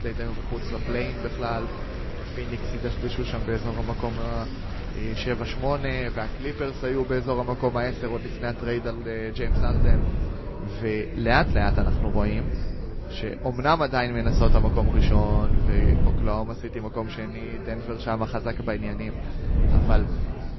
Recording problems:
garbled, watery; slightly; nothing above 5.5 kHz
murmuring crowd; noticeable; throughout; 10 dB below the speech
wind noise on the microphone; occasional gusts; 10 dB below the speech

